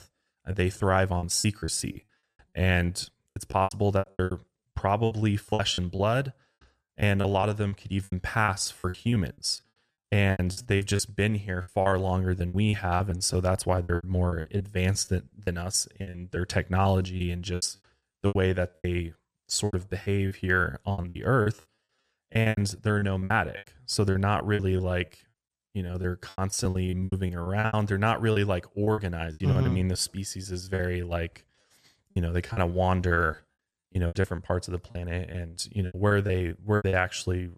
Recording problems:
choppy; very; 17% of the speech affected

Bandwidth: 14.5 kHz